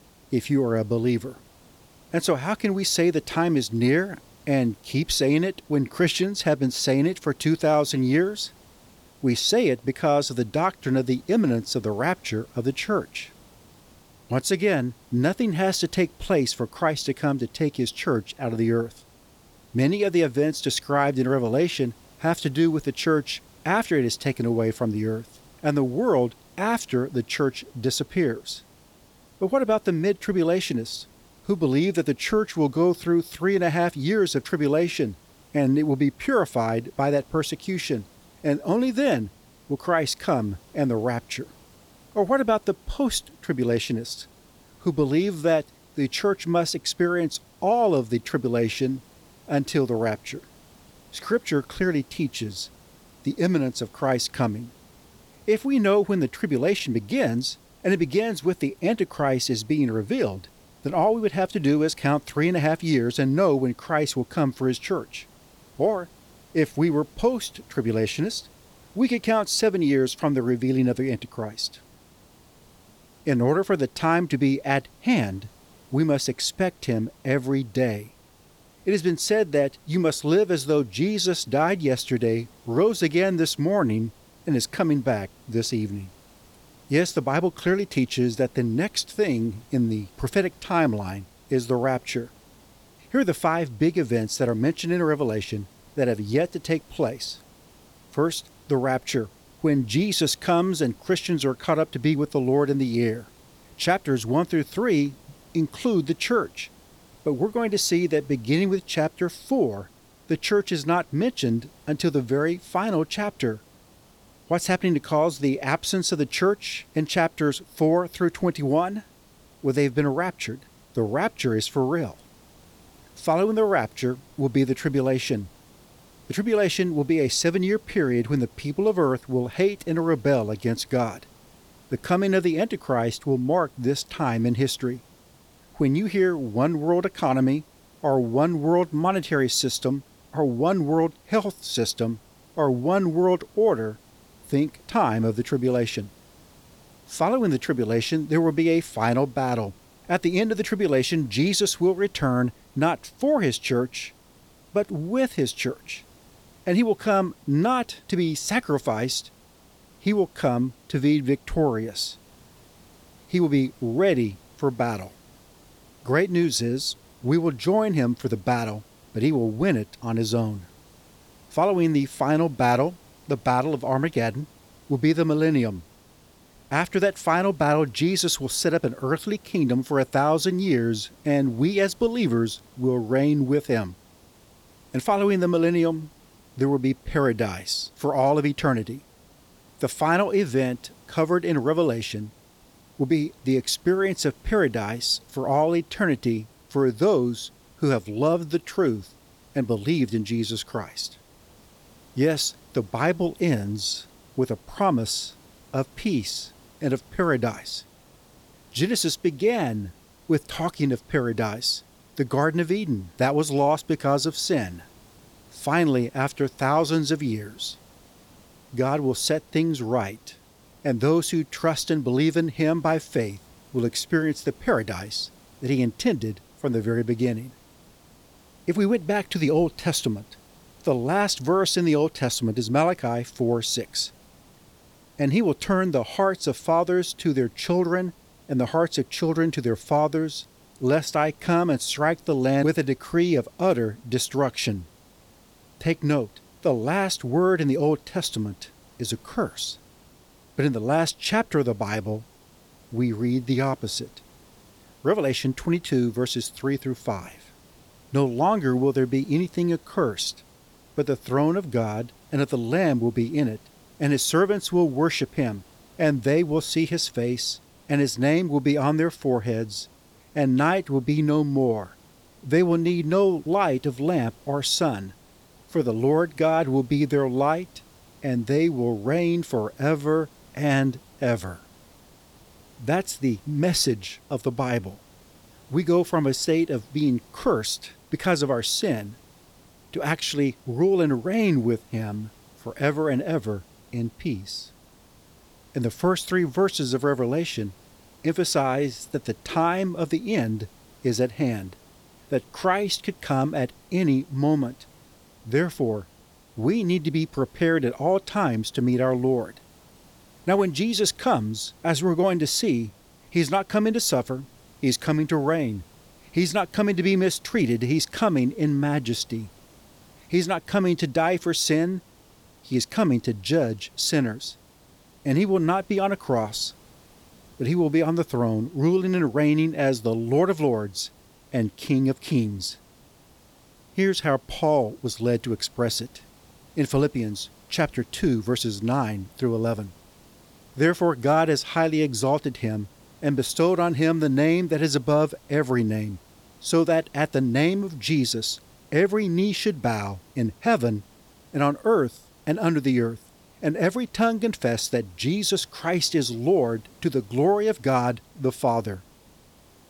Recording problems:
hiss; faint; throughout; 30 dB below the speech

